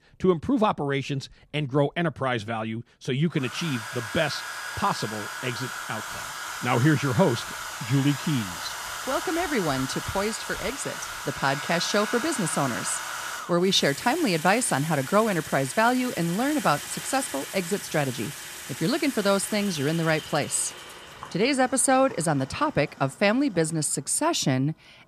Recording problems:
household noises; loud; throughout; 8 dB below the speech

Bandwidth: 14.5 kHz